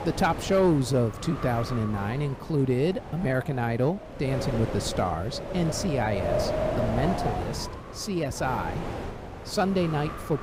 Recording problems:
wind noise on the microphone; heavy; 4 dB below the speech

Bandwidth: 15.5 kHz